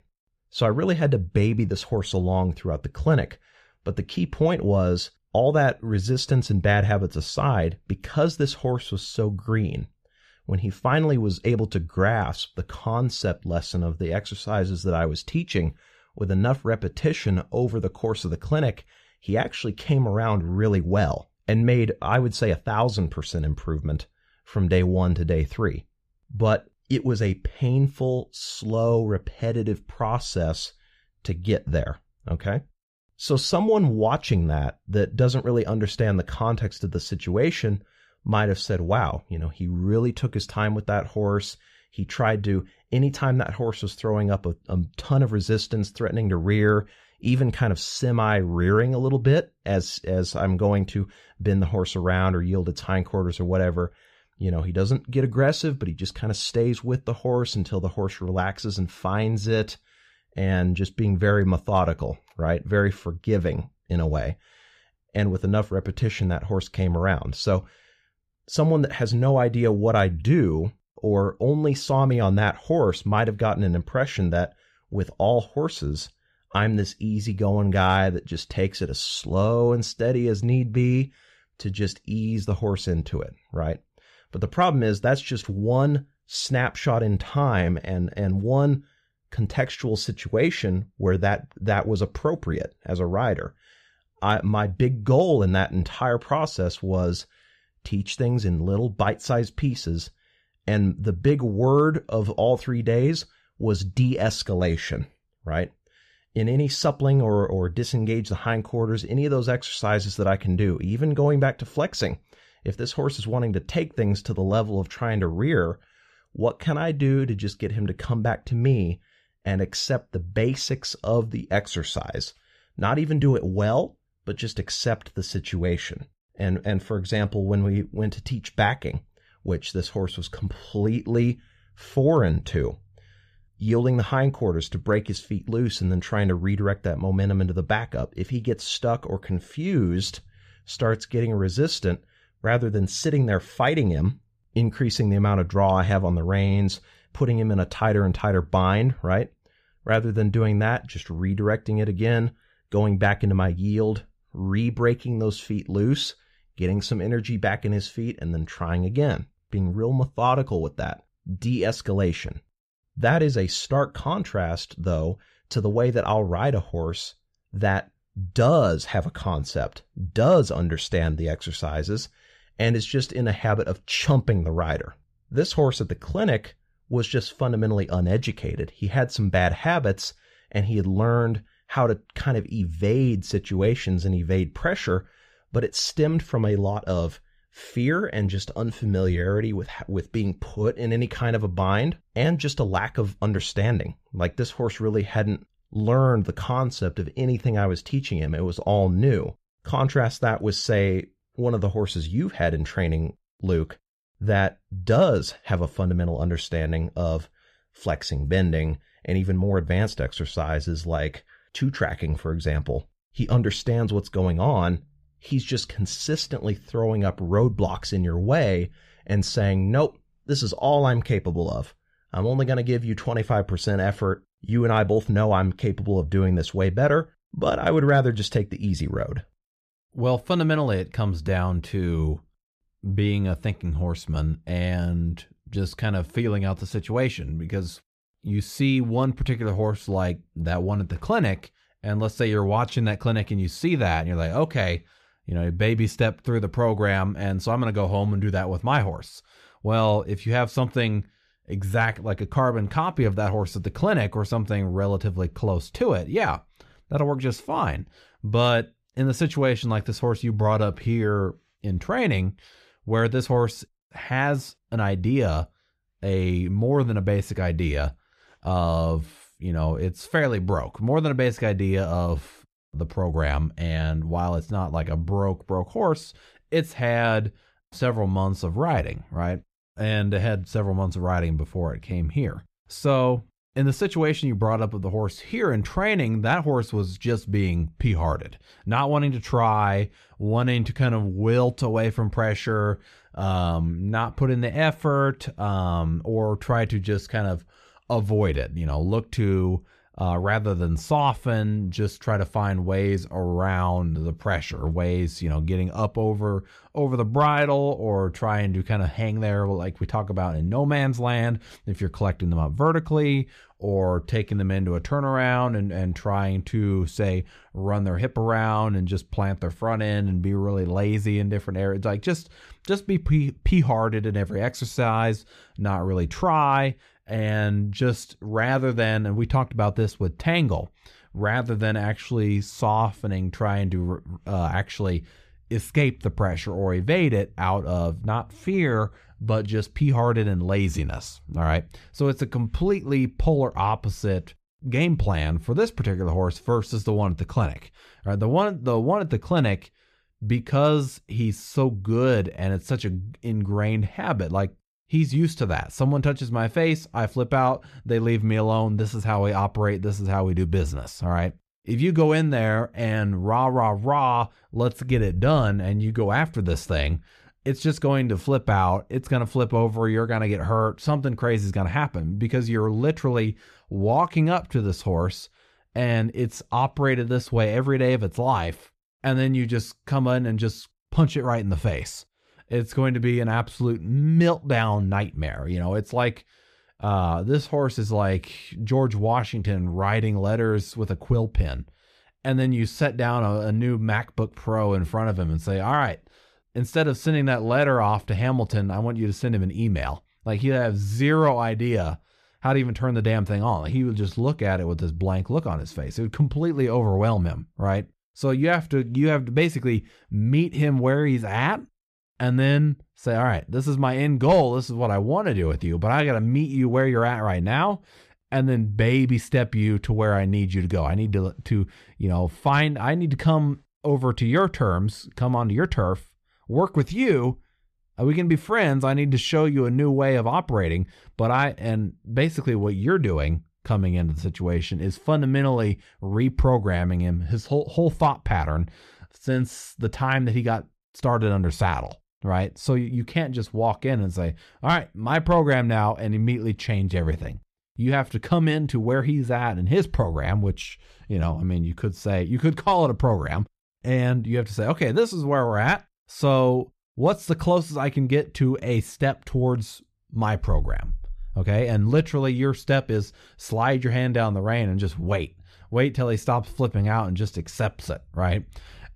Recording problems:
none

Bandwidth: 14.5 kHz